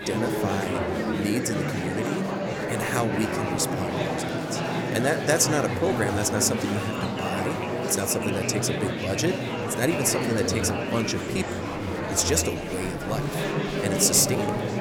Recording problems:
murmuring crowd; loud; throughout; 1 dB below the speech

